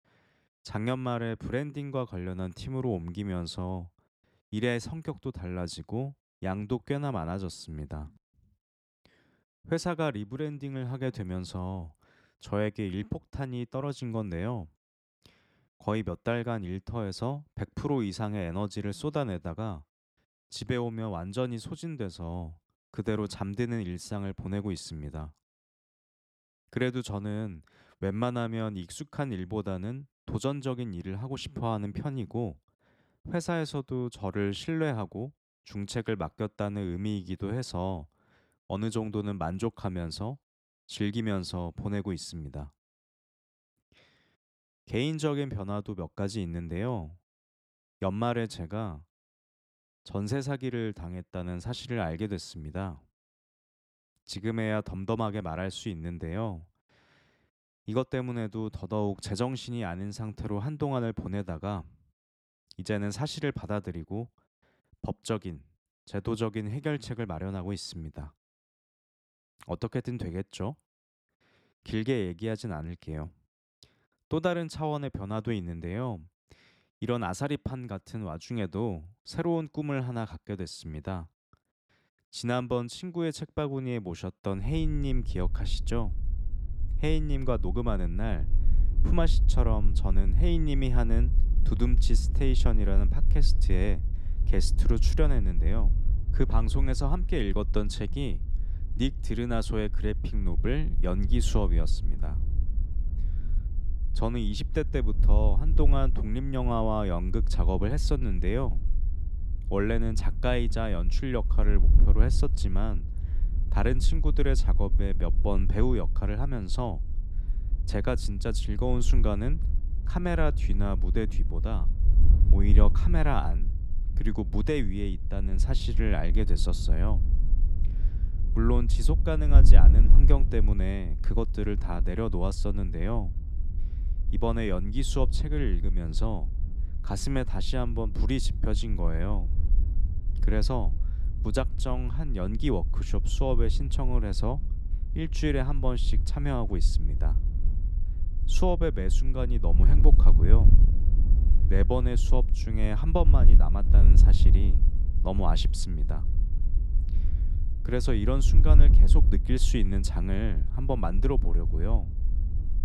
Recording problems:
wind noise on the microphone; occasional gusts; from 1:25 on; 15 dB below the speech

